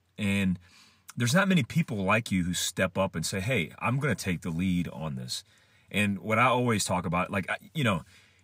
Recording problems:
none

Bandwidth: 15.5 kHz